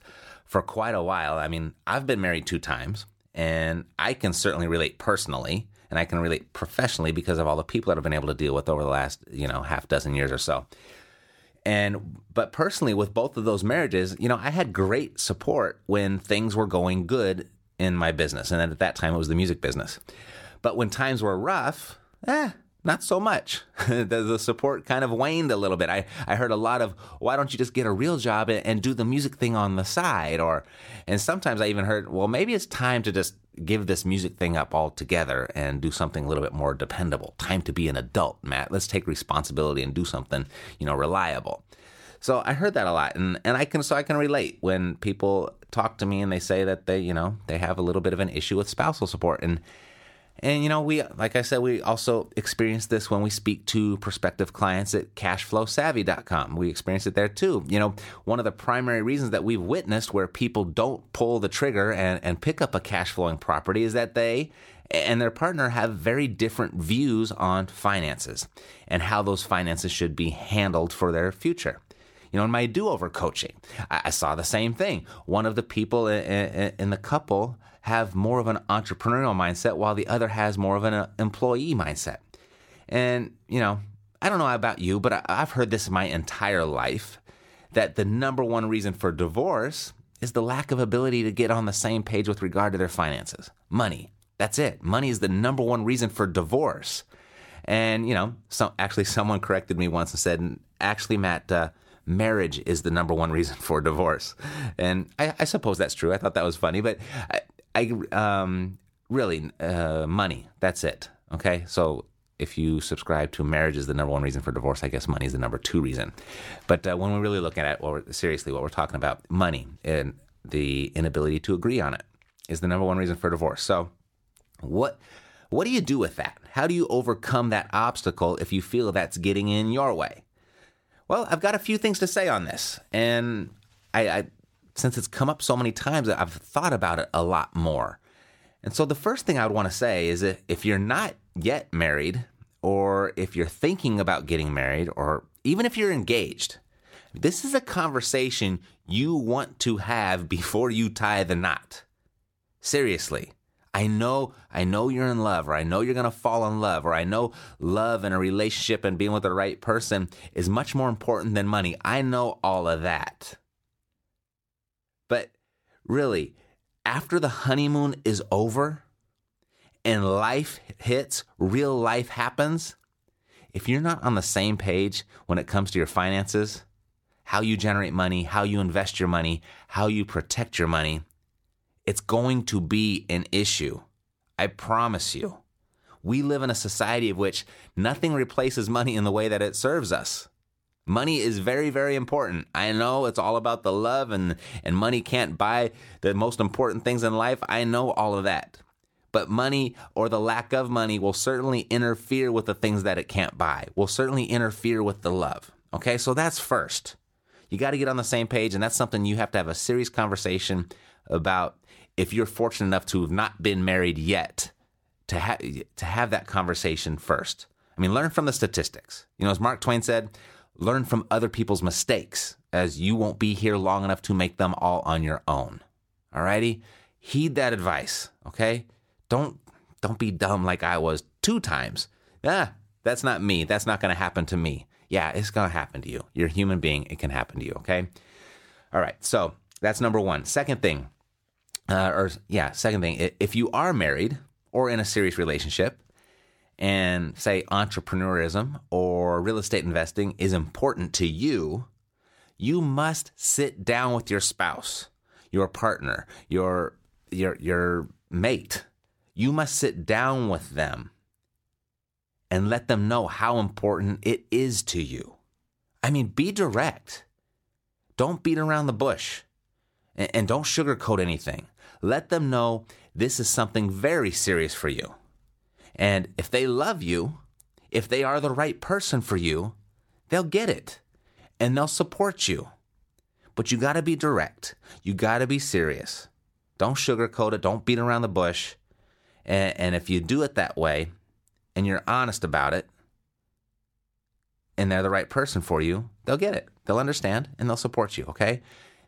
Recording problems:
none

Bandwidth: 17 kHz